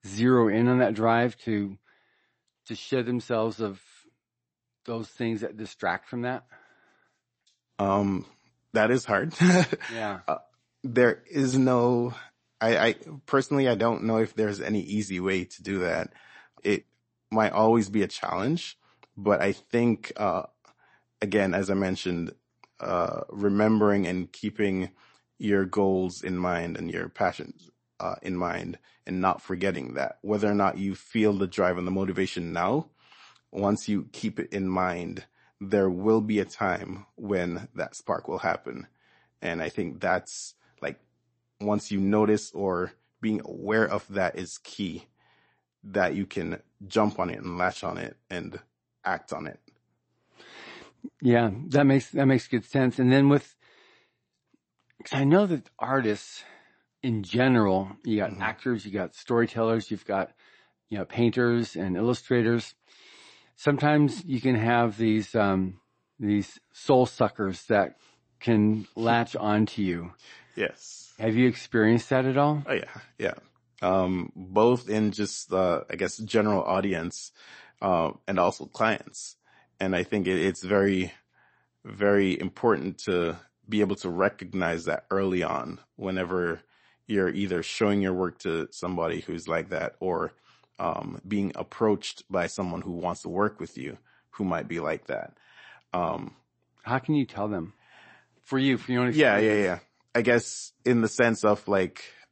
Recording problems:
garbled, watery; slightly; nothing above 8 kHz

